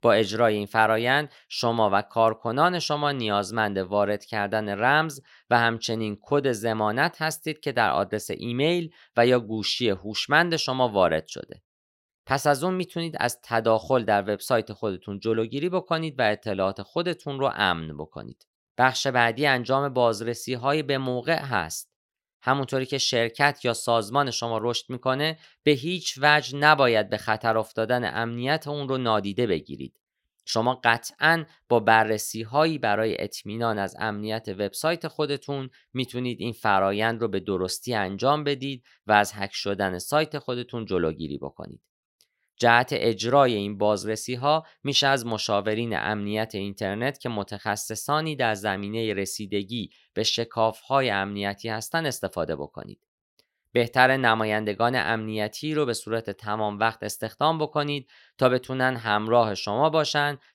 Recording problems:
none

